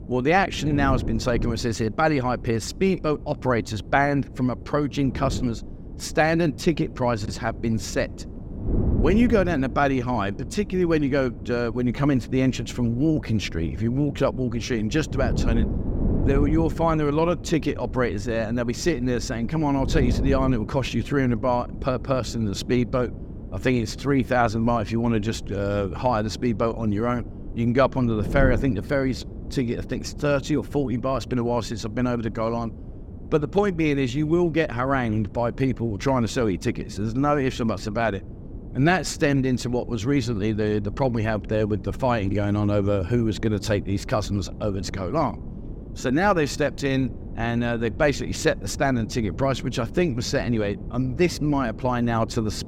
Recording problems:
wind noise on the microphone; occasional gusts; 15 dB below the speech

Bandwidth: 16.5 kHz